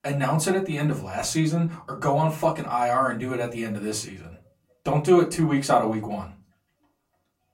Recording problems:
off-mic speech; far
room echo; very slight; dies away in 0.3 s

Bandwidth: 16 kHz